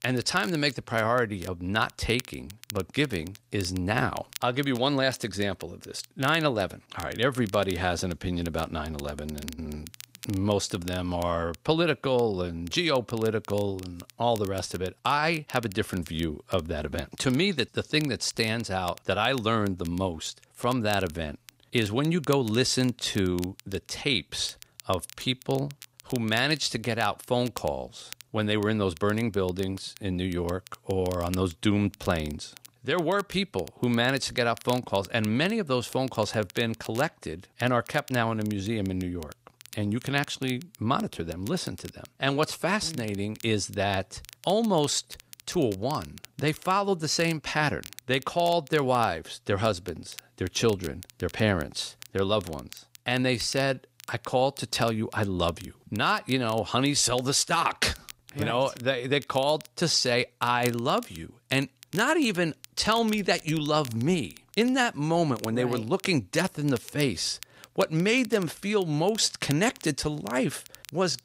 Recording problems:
crackle, like an old record; noticeable; 20 dB below the speech

